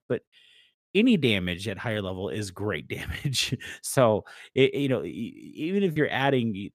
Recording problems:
choppy; occasionally; at 6 s; 1% of the speech affected

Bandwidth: 14.5 kHz